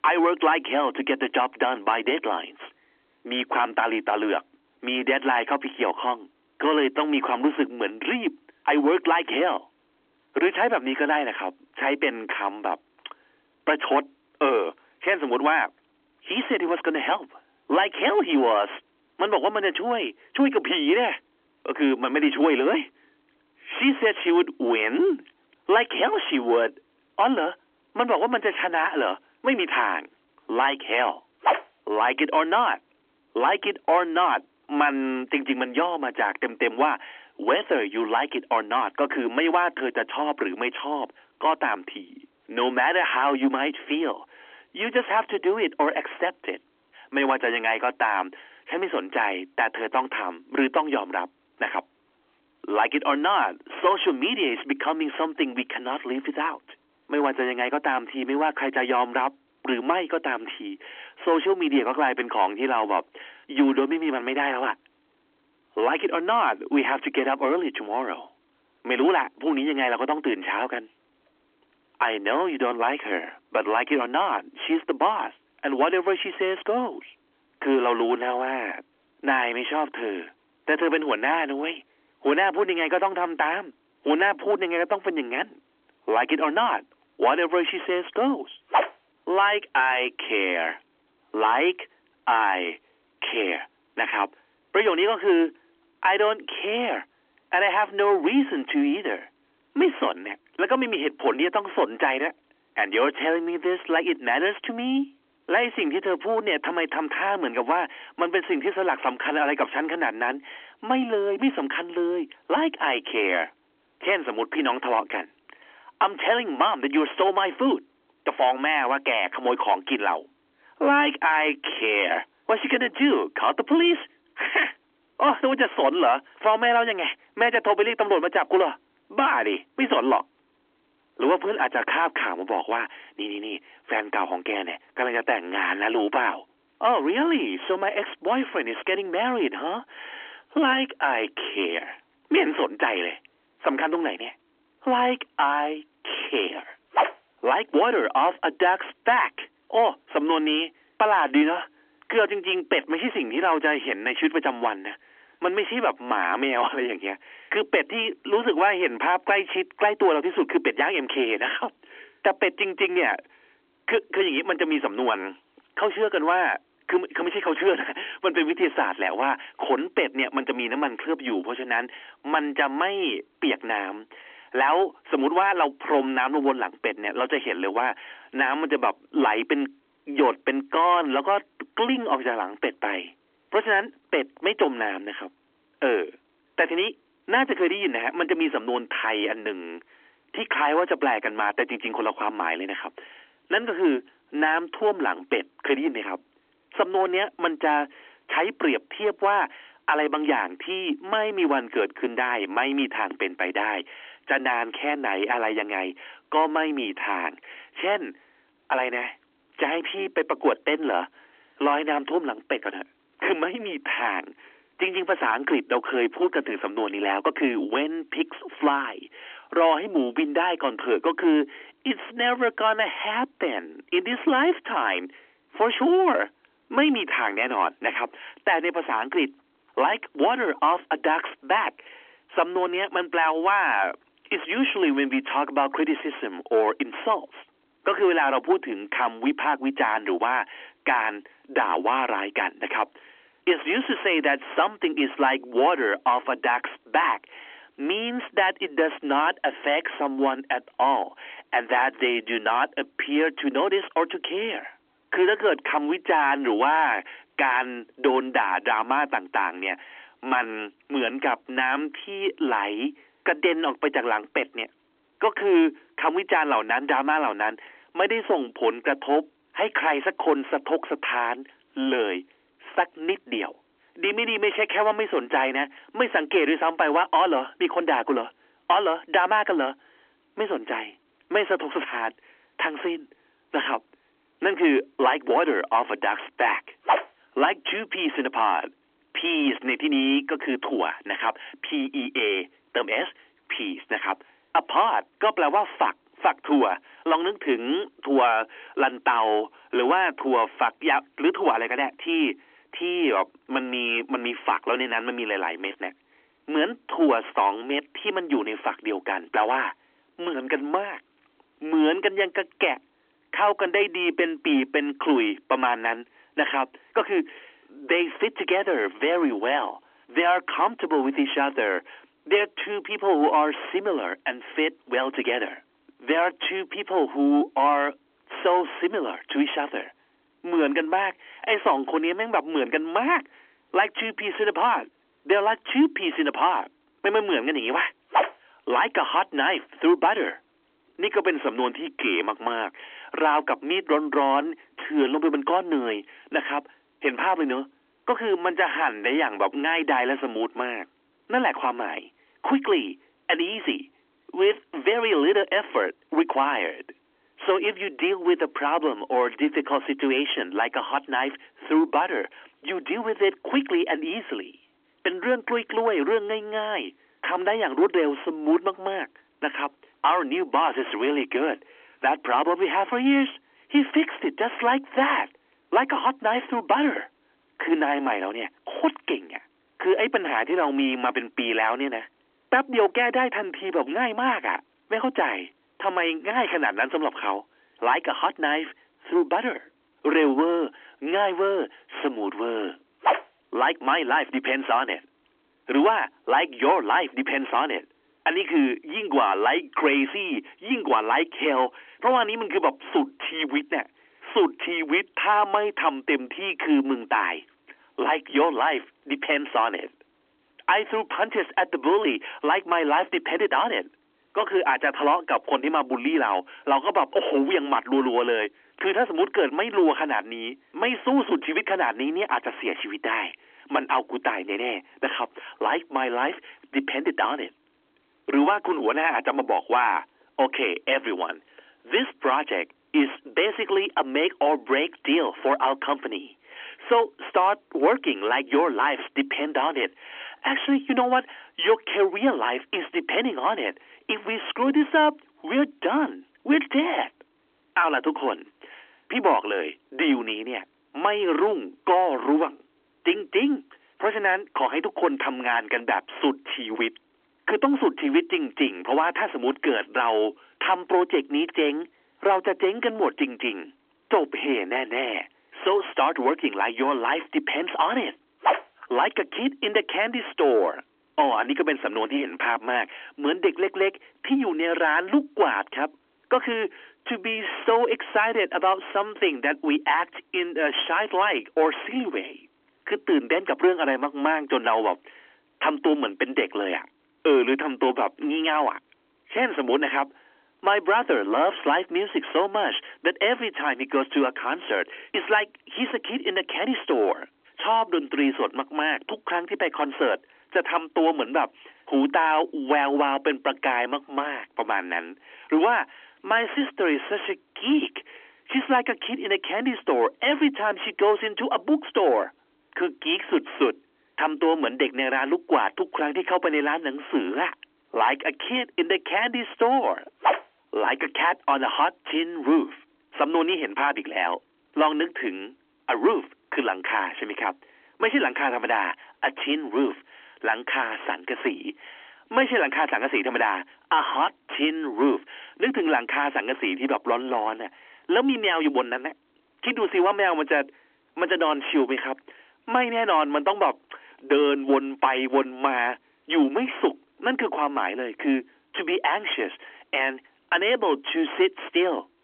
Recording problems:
phone-call audio; nothing above 3.5 kHz
distortion; slight; 10 dB below the speech

